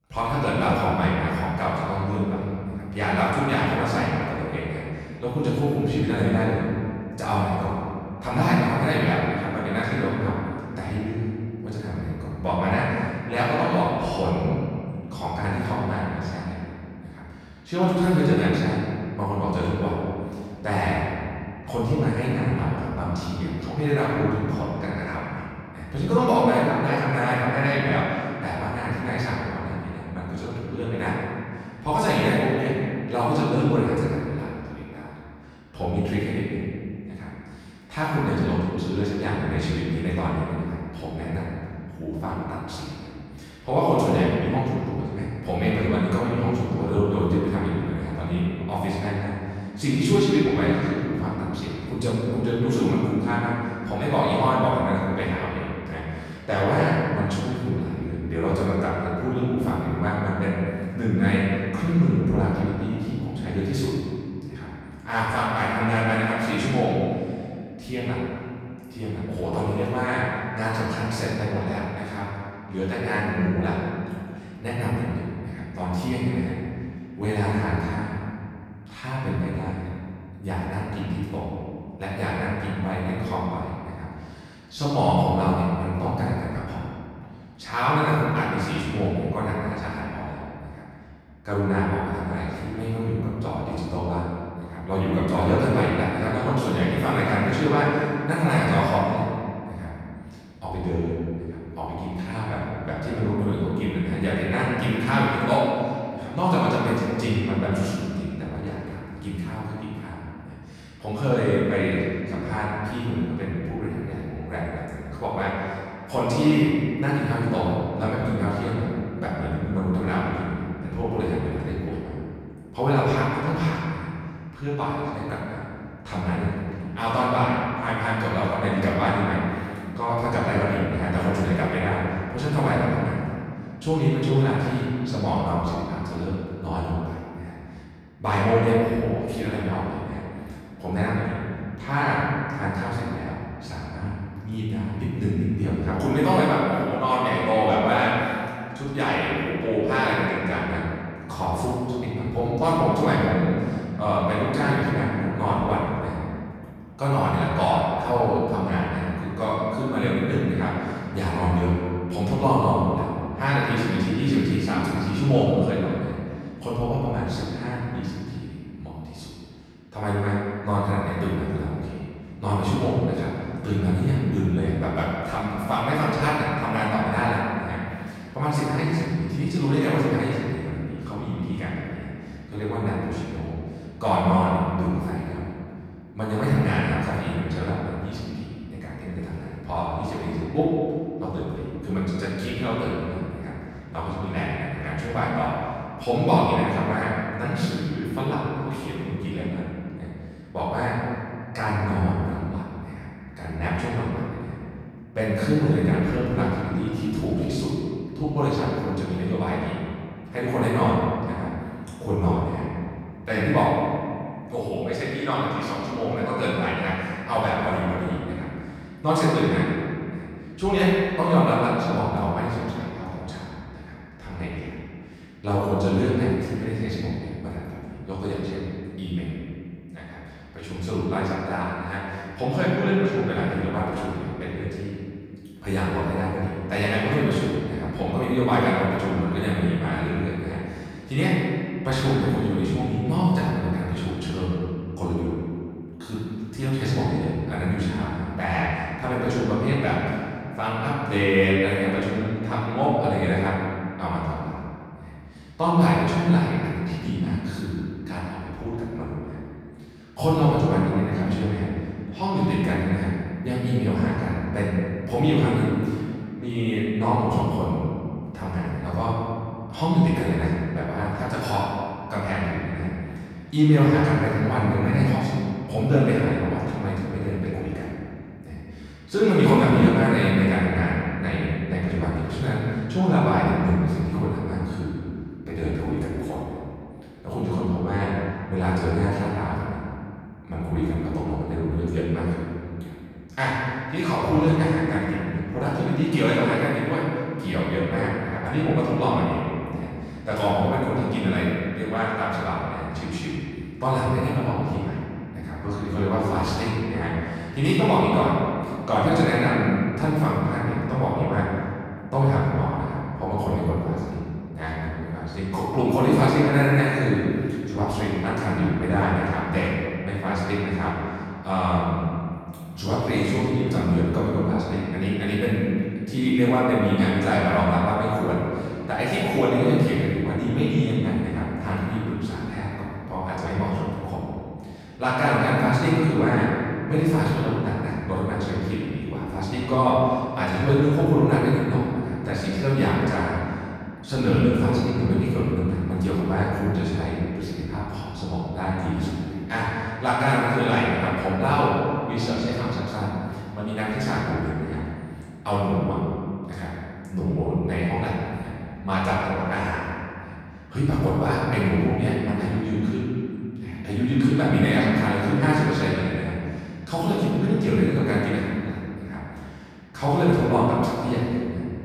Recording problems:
room echo; strong; dies away in 2.2 s
off-mic speech; far

